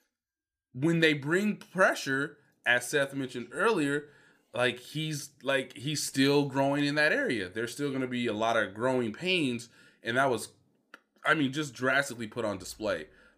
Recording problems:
none

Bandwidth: 15 kHz